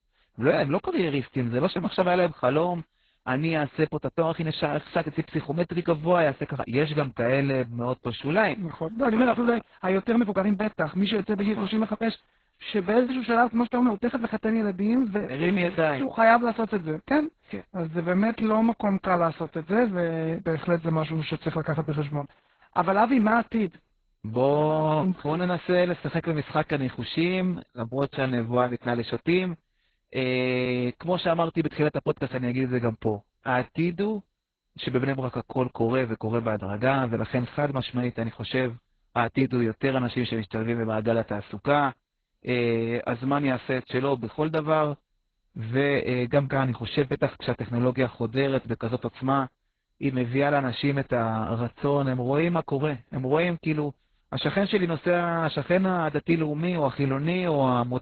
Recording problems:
garbled, watery; badly; nothing above 4 kHz
uneven, jittery; strongly; from 4 to 52 s

